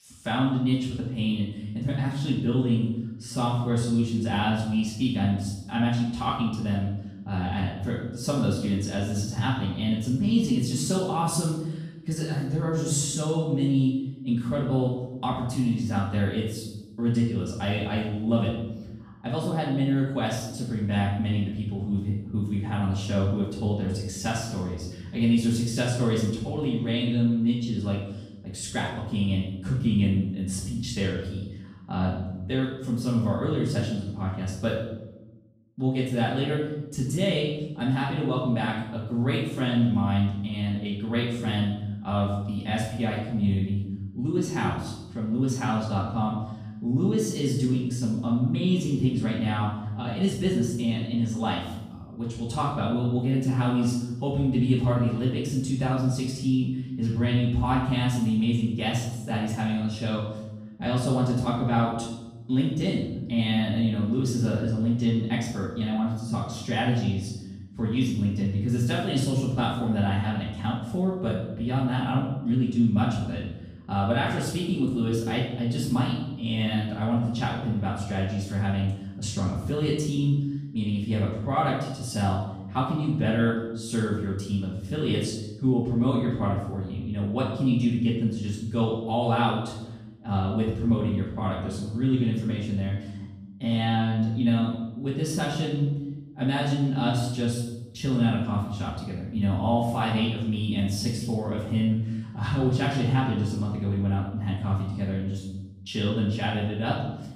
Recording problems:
off-mic speech; far
room echo; noticeable; dies away in 0.9 s

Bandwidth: 14.5 kHz